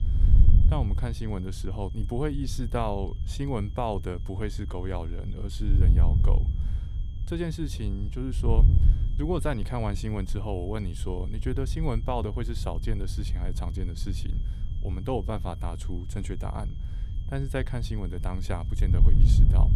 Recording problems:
wind noise on the microphone; occasional gusts; 10 dB below the speech
high-pitched whine; faint; throughout; 3 kHz, 25 dB below the speech

